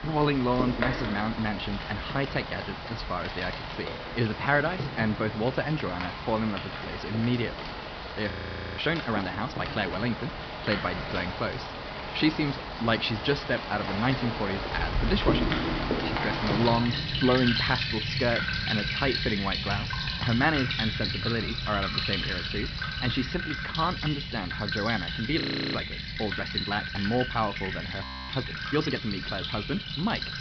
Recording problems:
high frequencies cut off; noticeable; nothing above 5.5 kHz
rain or running water; loud; throughout; 2 dB below the speech
audio freezing; at 8.5 s, at 25 s and at 28 s

